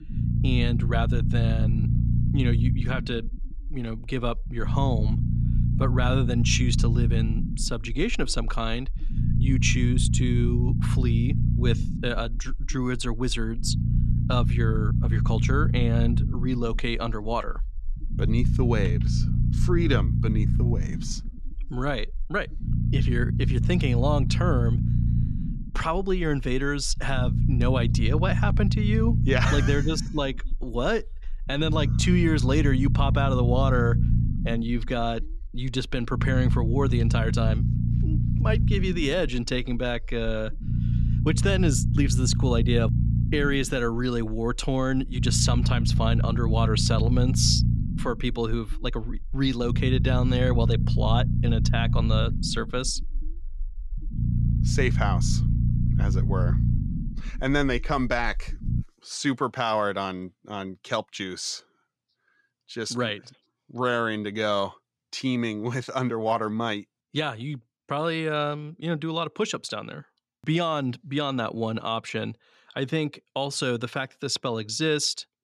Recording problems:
low rumble; loud; until 59 s; 8 dB below the speech

